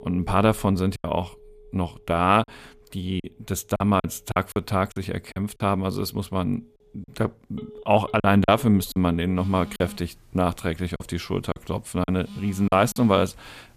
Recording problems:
alarms or sirens; noticeable; throughout; 20 dB below the speech
choppy; very; 8% of the speech affected

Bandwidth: 14.5 kHz